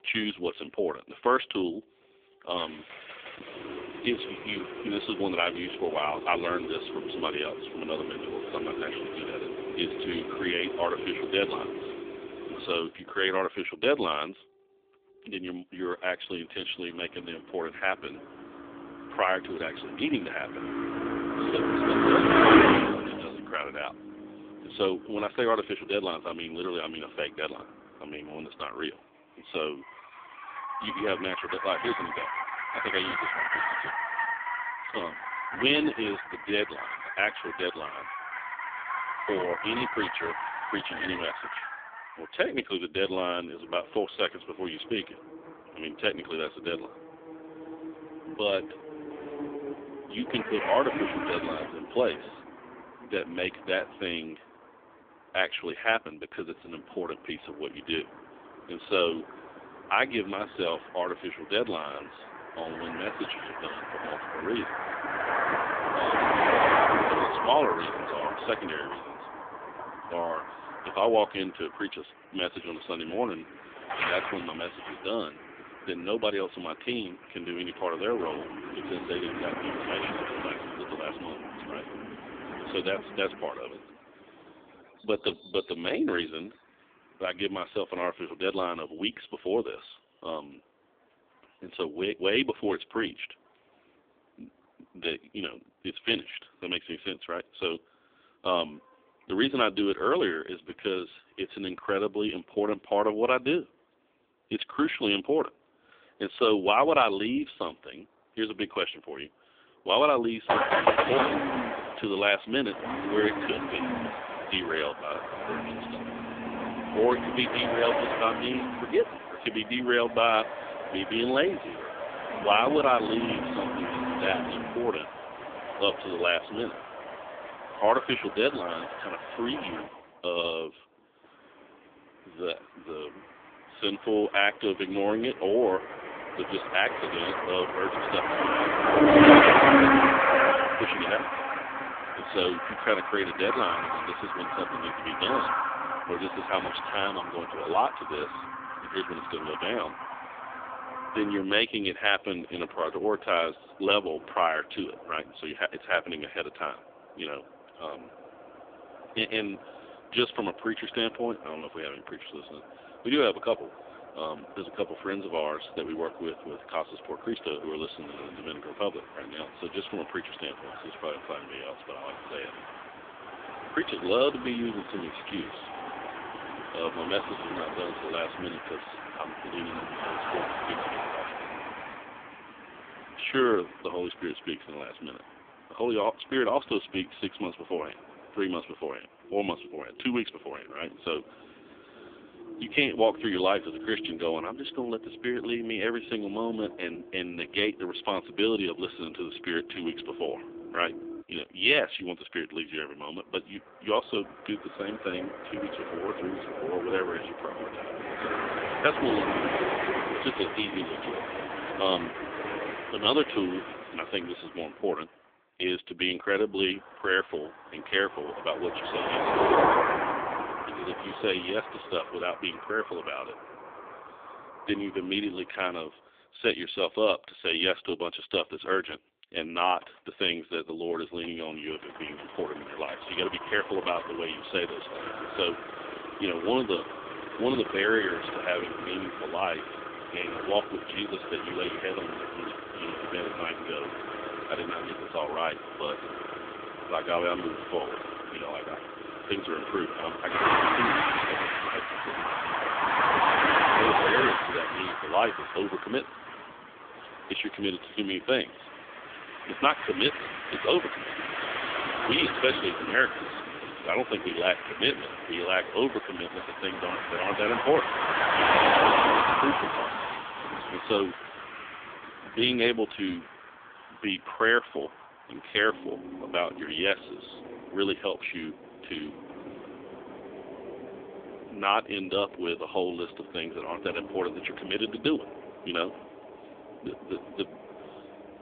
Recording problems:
phone-call audio; poor line; nothing above 3.5 kHz
traffic noise; very loud; throughout; as loud as the speech

